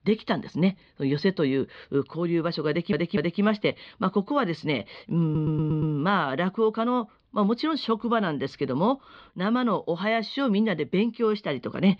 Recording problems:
muffled; very slightly; fading above 4 kHz
audio stuttering; at 2.5 s and at 5 s

